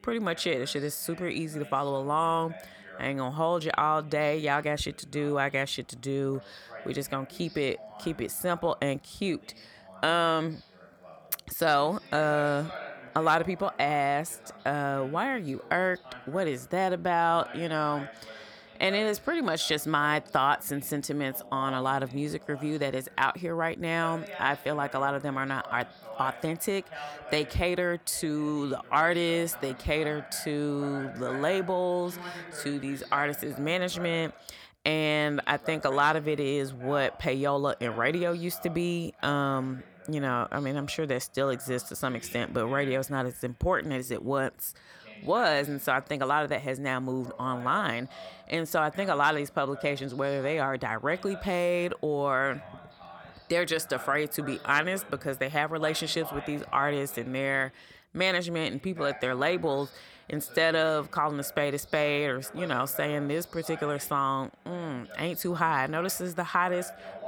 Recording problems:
voice in the background; noticeable; throughout; 15 dB below the speech

